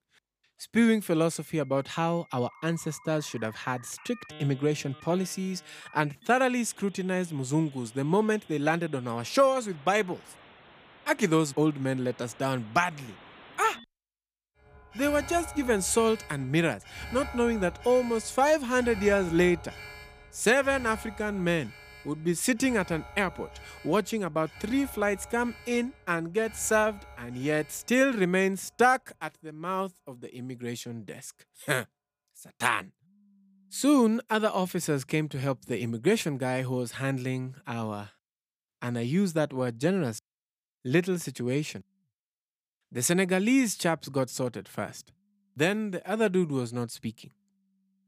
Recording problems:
alarms or sirens; noticeable; throughout; 20 dB below the speech

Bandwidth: 15 kHz